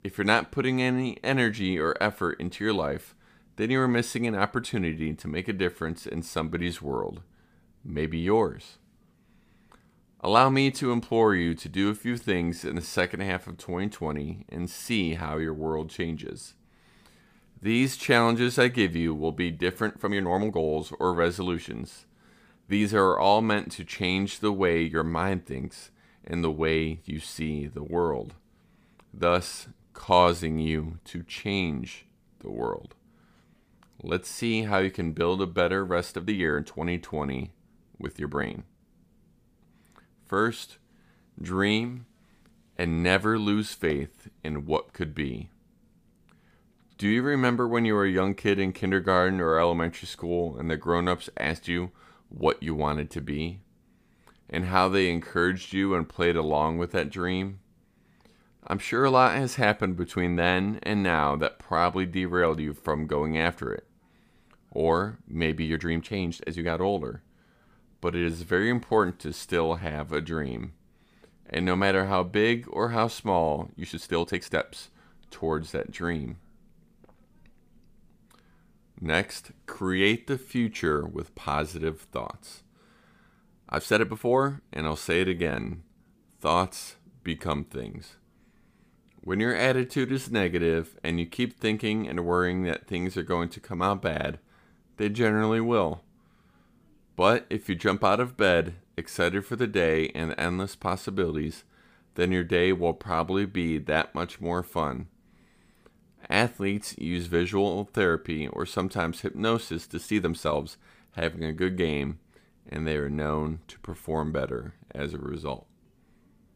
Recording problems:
uneven, jittery; strongly; from 10 s to 1:51

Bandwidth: 15 kHz